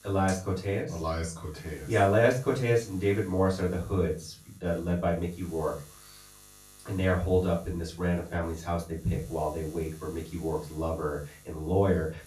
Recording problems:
off-mic speech; far
room echo; slight; dies away in 0.3 s
electrical hum; faint; throughout; 50 Hz, 25 dB below the speech

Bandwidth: 14.5 kHz